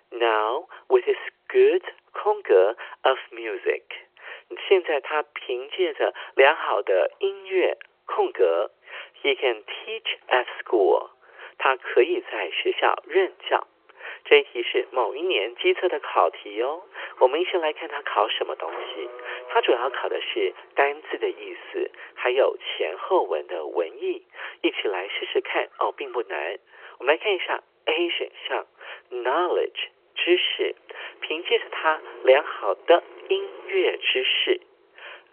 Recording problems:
phone-call audio; nothing above 3 kHz
traffic noise; faint; throughout; 20 dB below the speech

